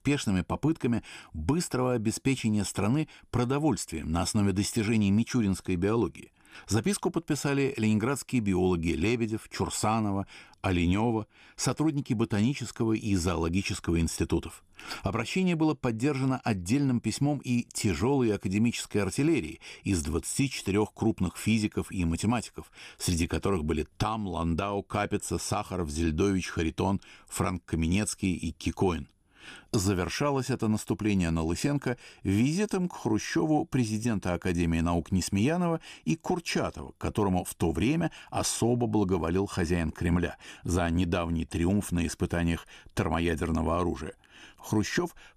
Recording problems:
none

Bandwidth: 15 kHz